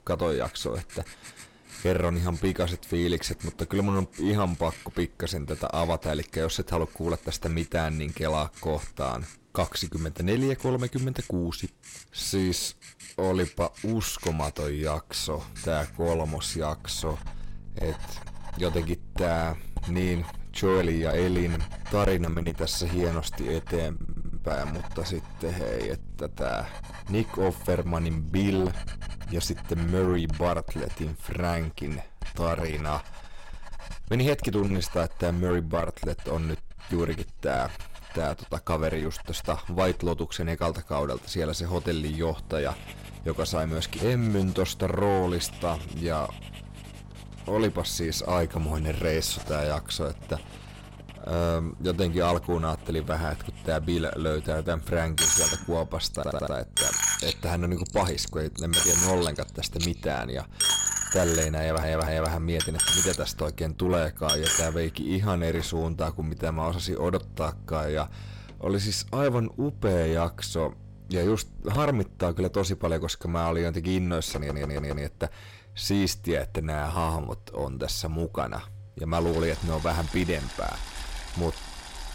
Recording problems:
distortion; slight; 10 dB below the speech
household noises; loud; throughout; 3 dB below the speech
electrical hum; faint; from 15 to 30 s and from 42 s to 1:13; 50 Hz, 25 dB below the speech
audio stuttering; 4 times, first at 24 s

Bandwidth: 16 kHz